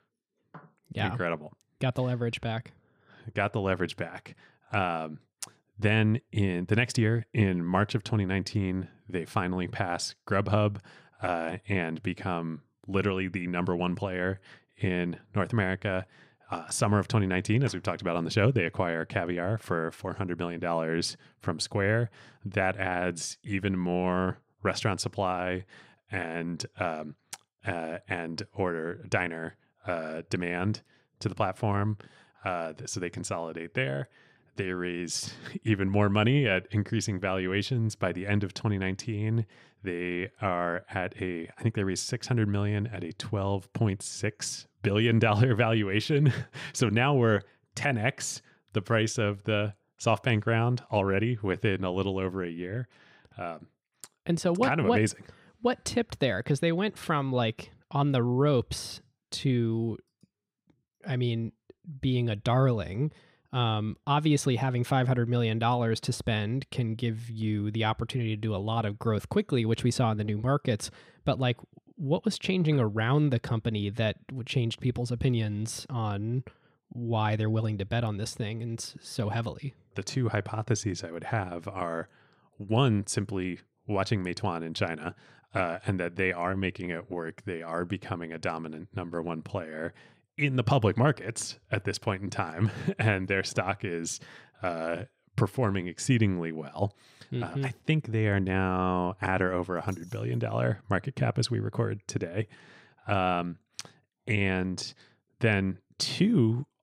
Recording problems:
none

